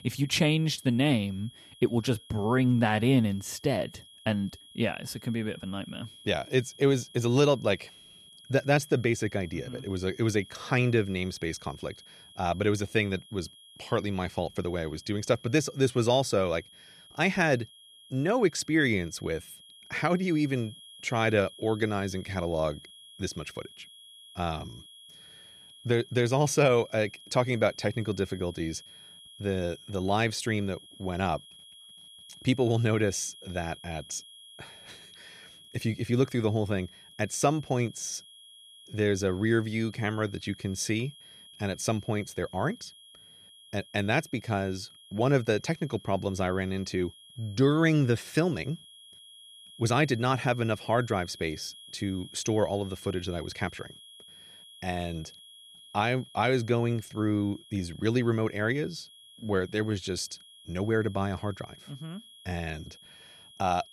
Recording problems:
high-pitched whine; faint; throughout; 3.5 kHz, 20 dB below the speech

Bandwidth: 14 kHz